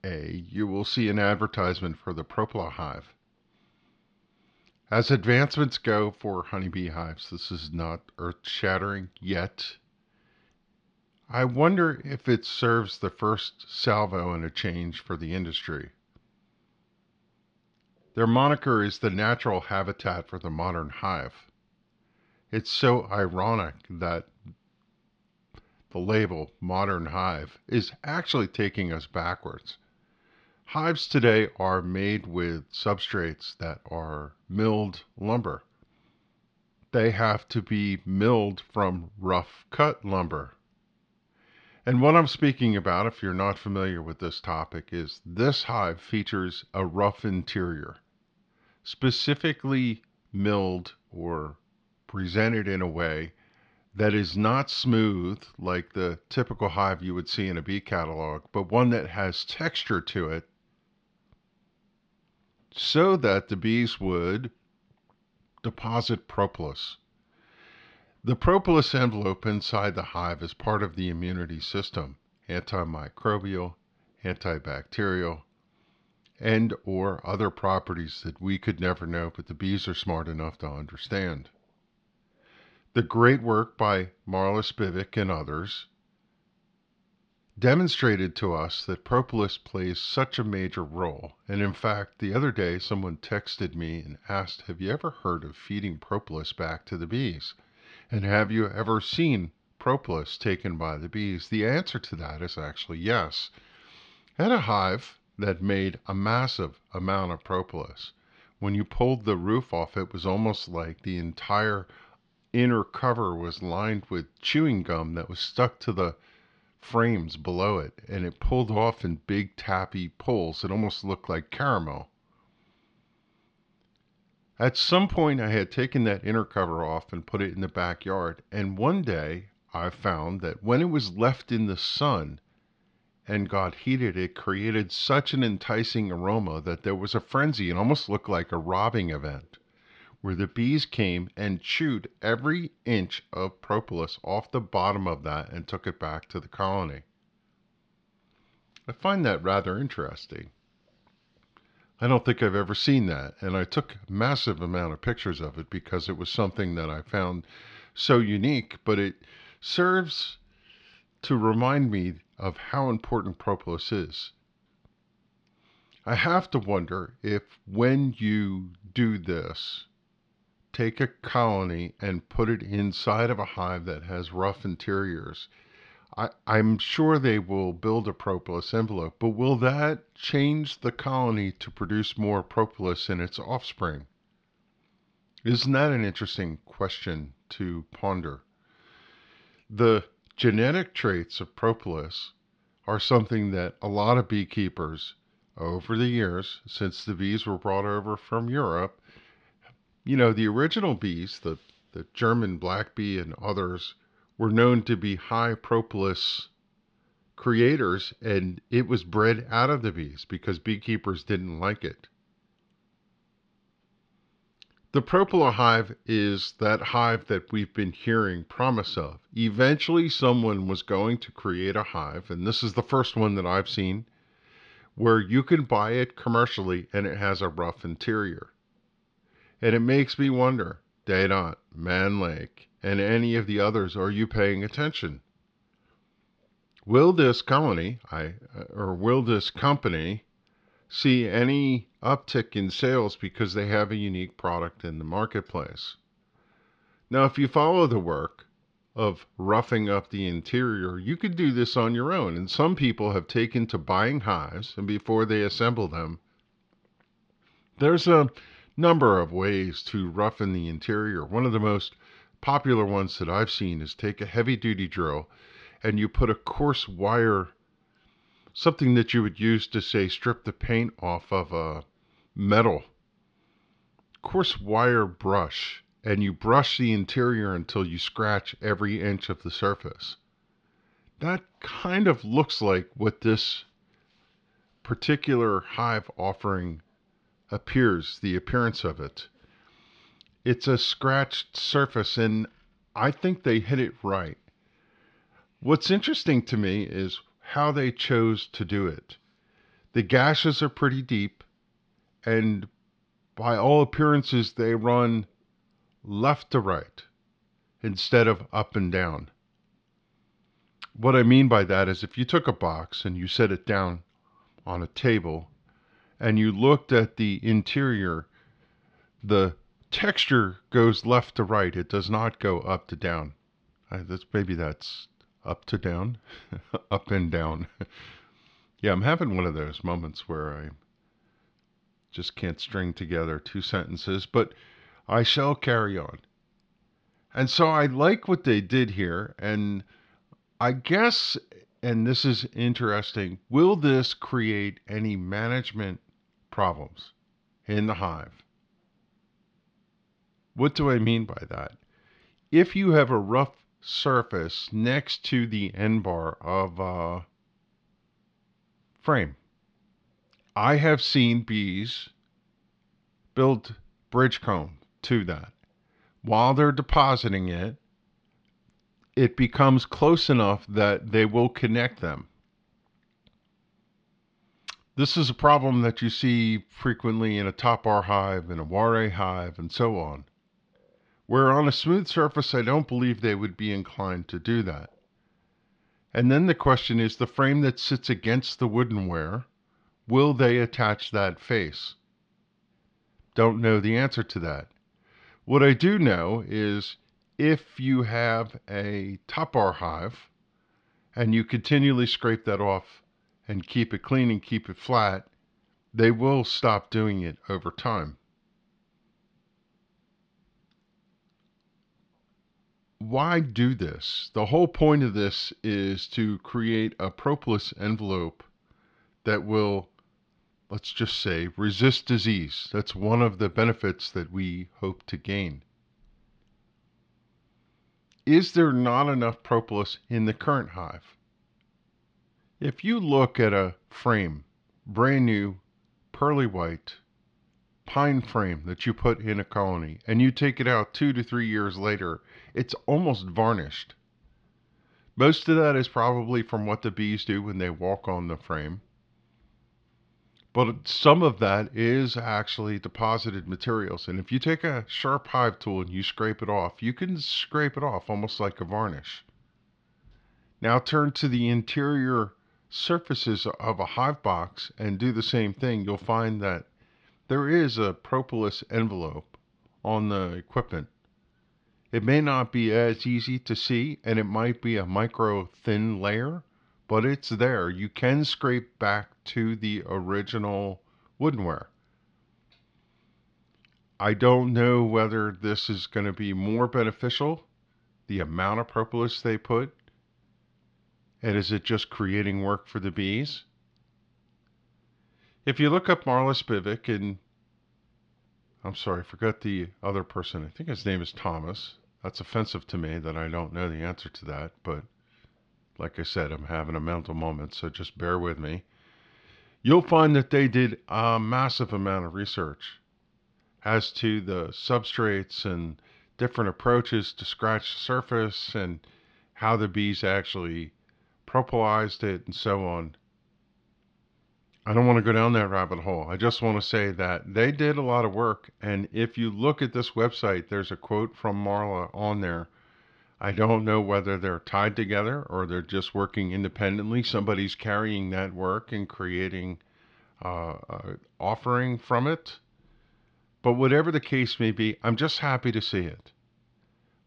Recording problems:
muffled; very slightly; fading above 4 kHz

